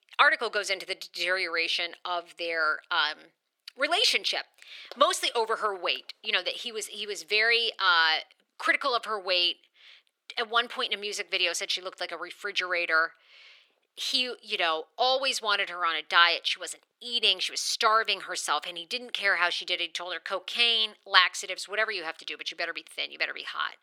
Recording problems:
thin; very; fading below 450 Hz

